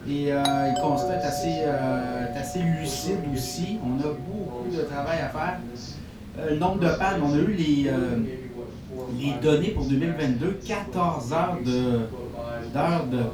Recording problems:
off-mic speech; far
room echo; slight; dies away in 0.2 s
voice in the background; noticeable; throughout; 10 dB below the speech
hiss; faint; throughout; 20 dB below the speech
low rumble; faint; throughout; 25 dB below the speech
doorbell; noticeable; until 3 s; peak level with the speech

